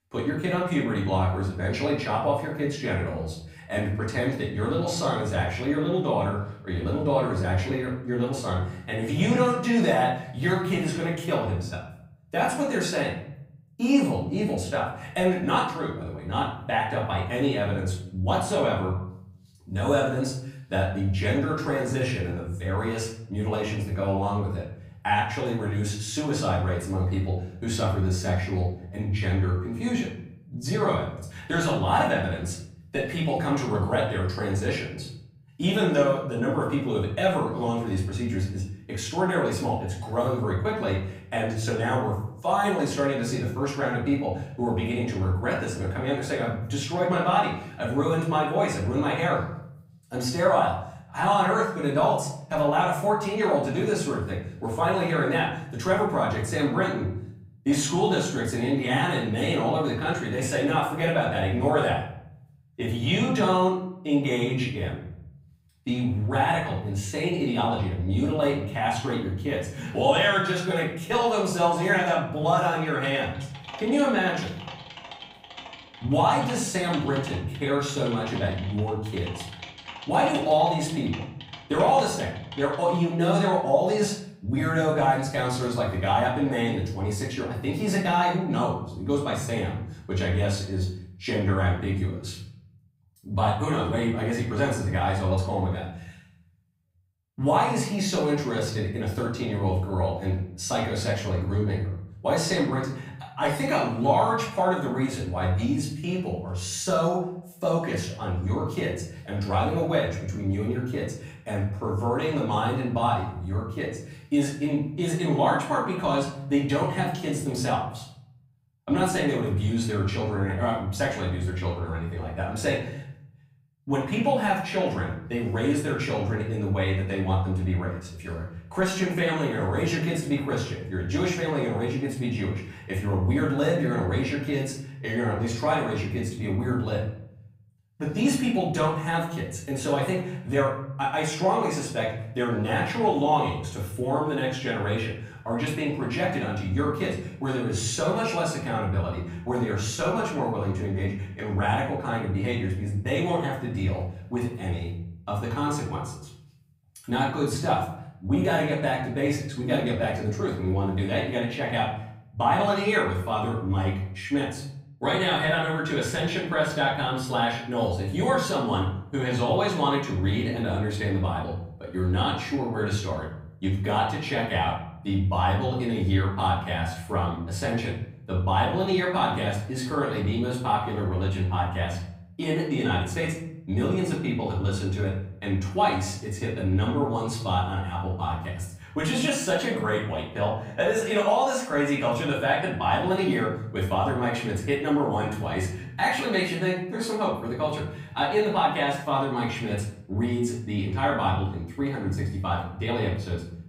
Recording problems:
off-mic speech; far
room echo; noticeable; dies away in 0.7 s
keyboard typing; faint; from 1:13 to 1:23; peak 10 dB below the speech

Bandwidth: 15.5 kHz